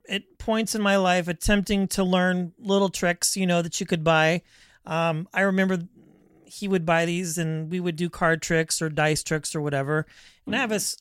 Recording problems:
none

